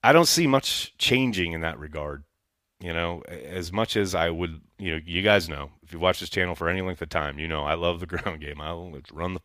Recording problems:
none

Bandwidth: 15 kHz